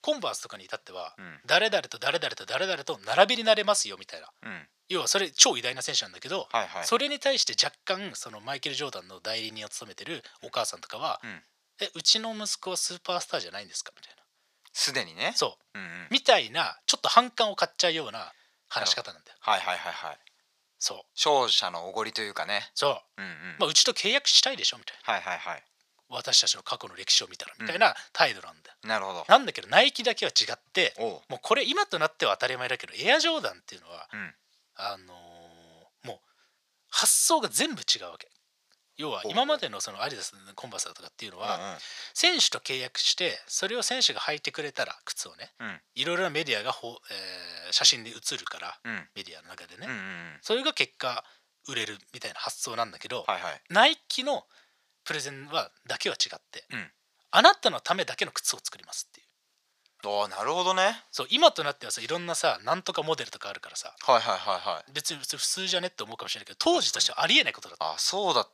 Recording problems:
thin; very; fading below 700 Hz

